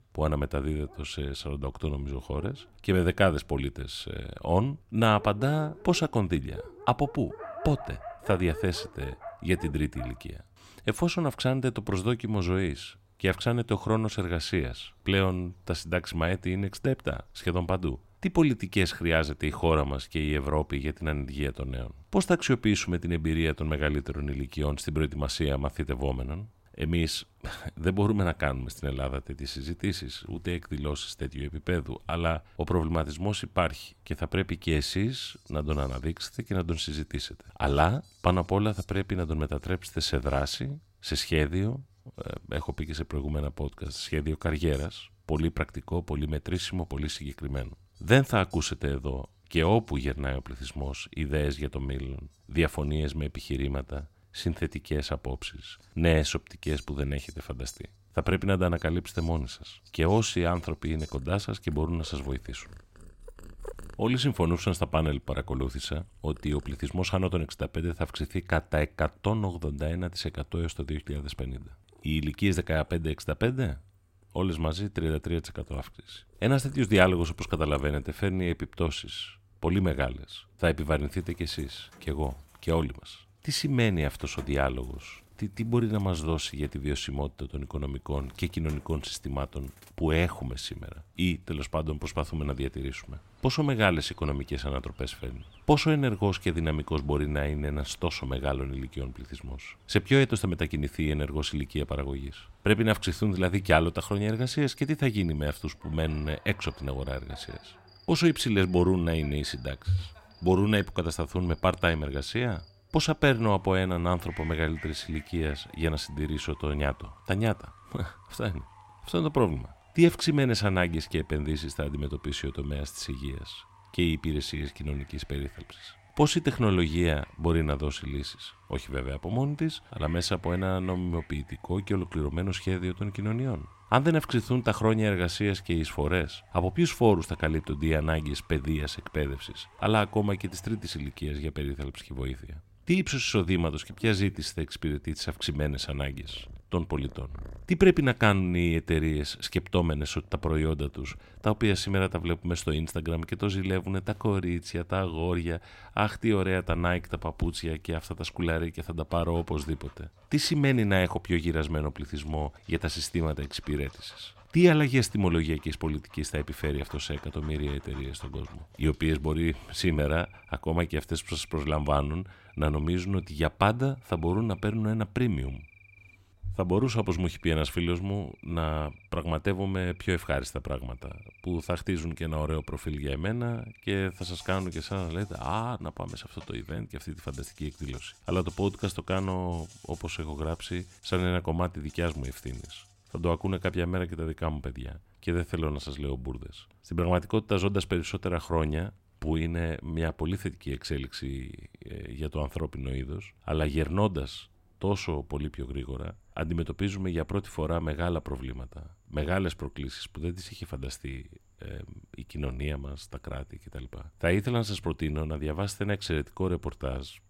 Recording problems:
animal sounds; faint; throughout; 25 dB below the speech

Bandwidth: 16 kHz